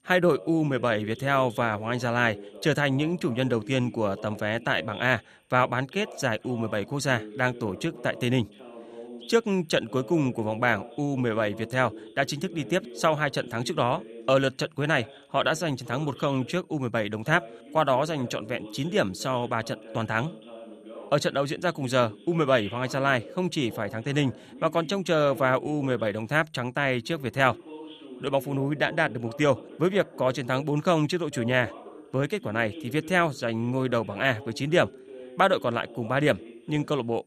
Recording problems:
voice in the background; noticeable; throughout; 15 dB below the speech

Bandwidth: 14.5 kHz